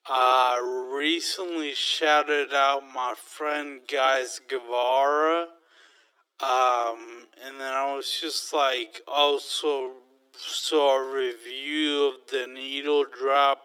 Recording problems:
thin; very; fading below 300 Hz
wrong speed, natural pitch; too slow; 0.5 times normal speed

